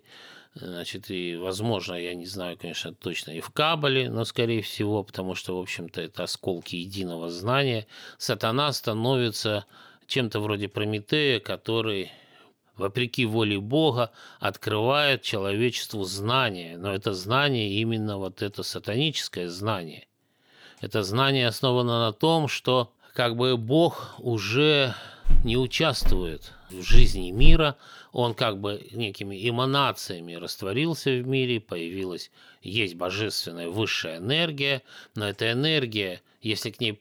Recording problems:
footsteps; noticeable; from 25 to 28 s; peak level with the speech

